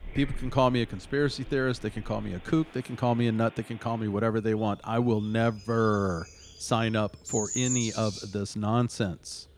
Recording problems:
animal sounds; loud; throughout; 9 dB below the speech
rain or running water; faint; until 3 s; 20 dB below the speech

